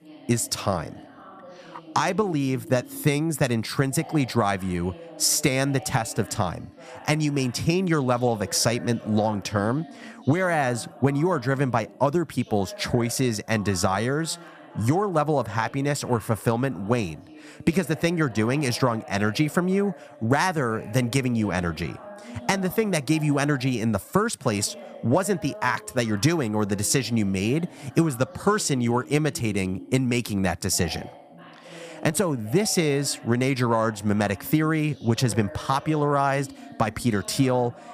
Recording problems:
background chatter; noticeable; throughout; 2 voices, 20 dB below the speech

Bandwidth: 15 kHz